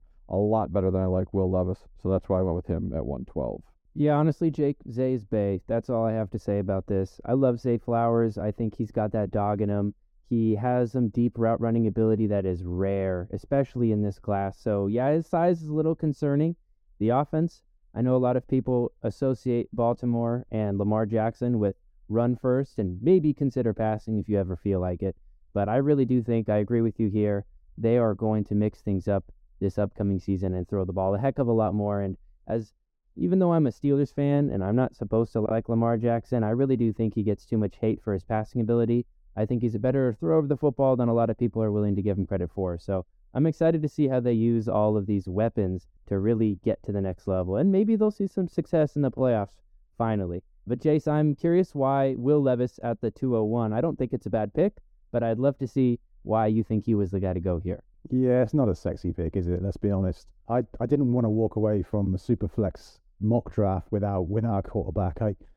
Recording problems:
muffled; very; fading above 1 kHz

